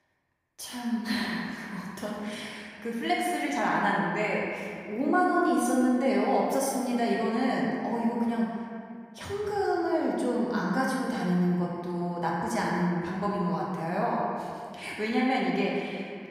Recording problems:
off-mic speech; far
room echo; noticeable; dies away in 2 s

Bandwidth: 15.5 kHz